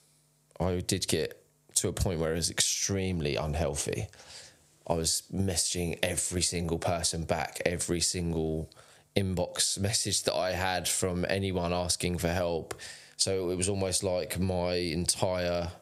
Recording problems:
squashed, flat; somewhat

